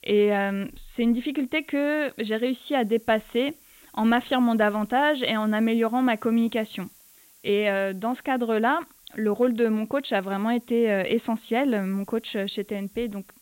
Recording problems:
high frequencies cut off; severe; nothing above 4 kHz
hiss; faint; throughout; 25 dB below the speech

